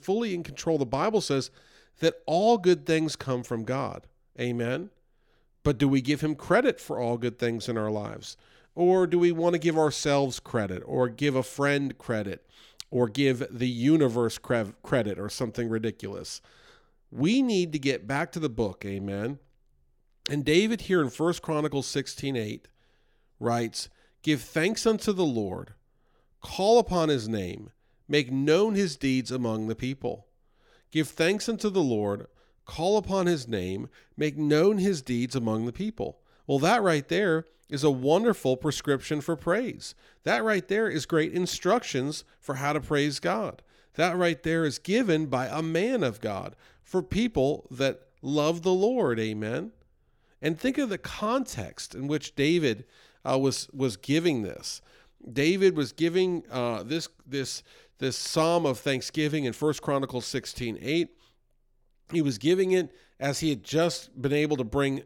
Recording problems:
none

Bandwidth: 17 kHz